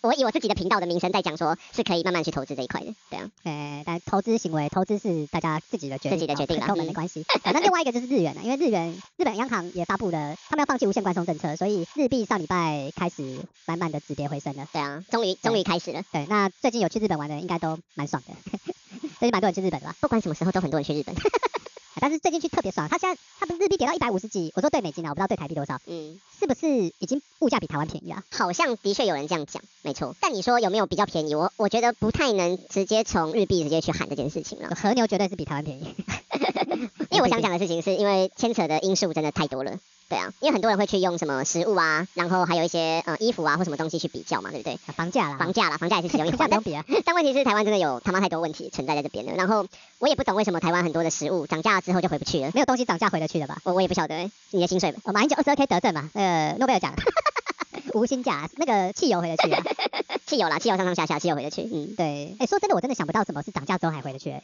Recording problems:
wrong speed and pitch; too fast and too high; 1.5 times normal speed
high frequencies cut off; noticeable; nothing above 7 kHz
hiss; faint; throughout; 25 dB below the speech

